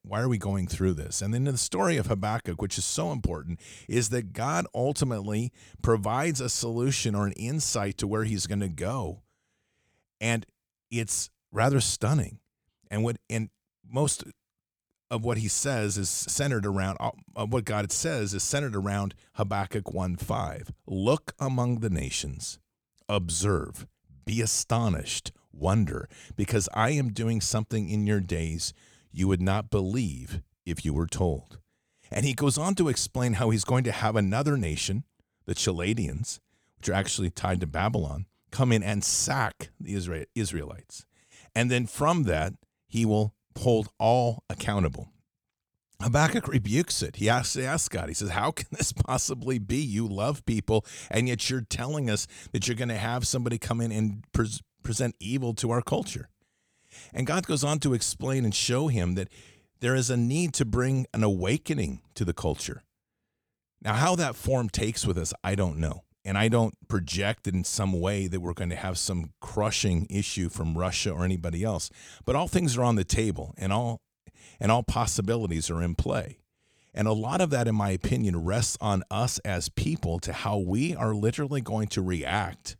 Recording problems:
none

